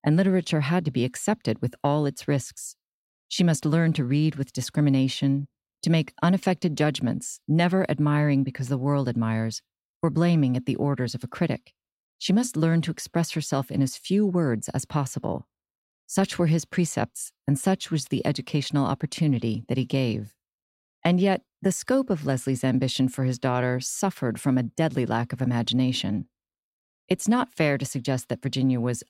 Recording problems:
none

